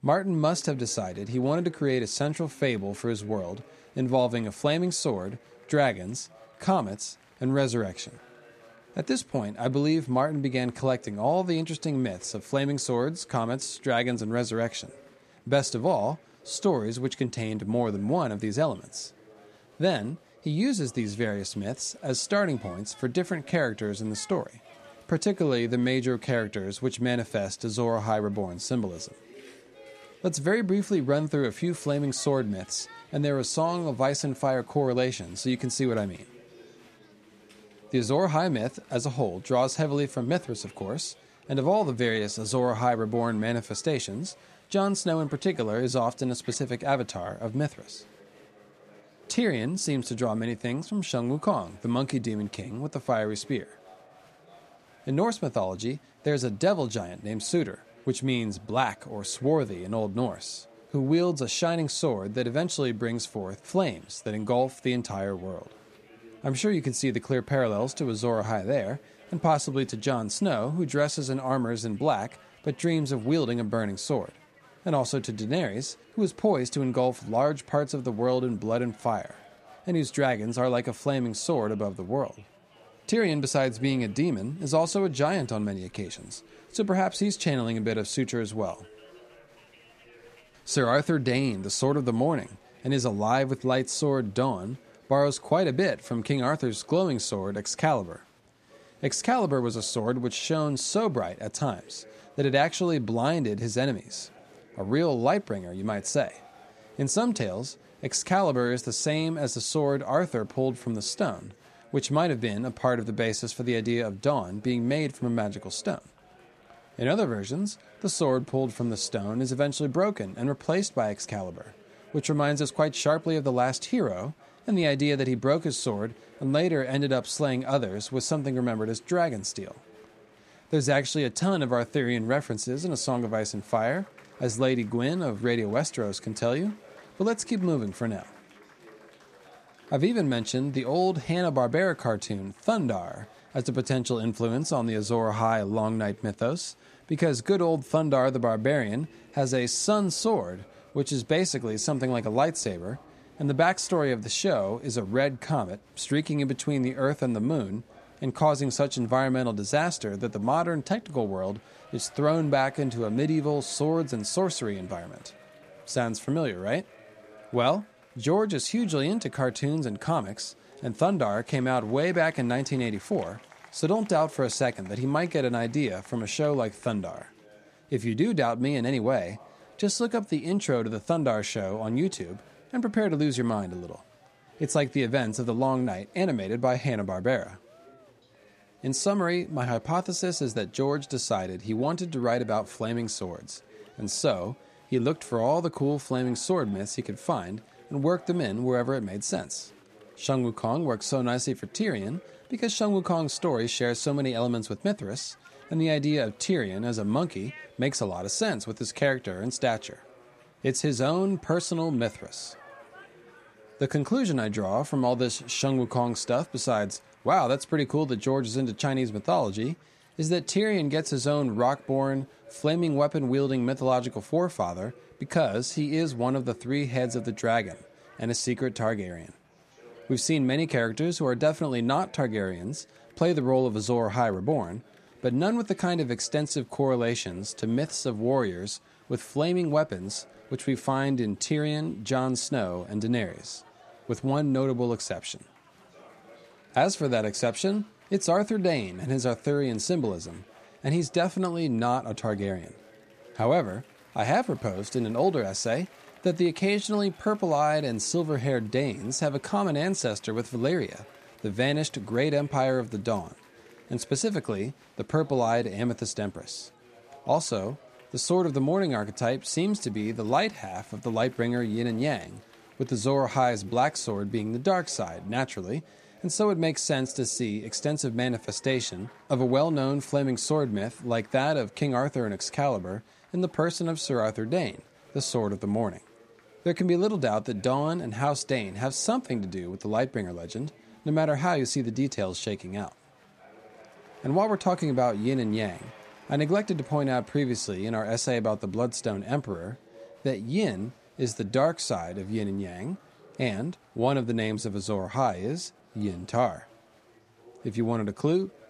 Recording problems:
chatter from many people; faint; throughout; 25 dB below the speech

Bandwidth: 14.5 kHz